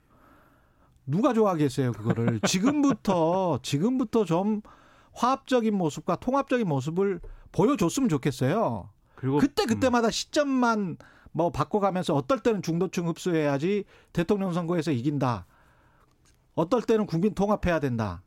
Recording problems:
none

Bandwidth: 16 kHz